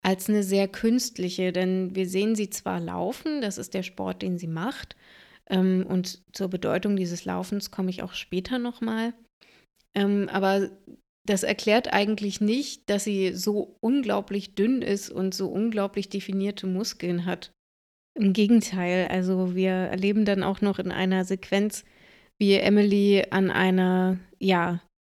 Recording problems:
none

